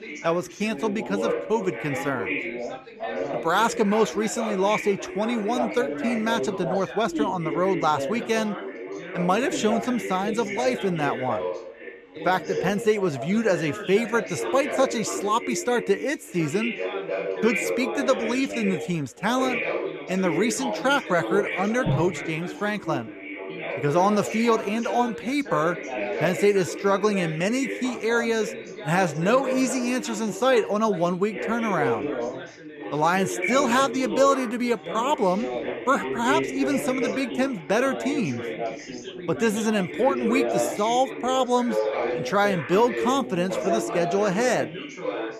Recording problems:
background chatter; loud; throughout; 4 voices, 6 dB below the speech

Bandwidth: 14.5 kHz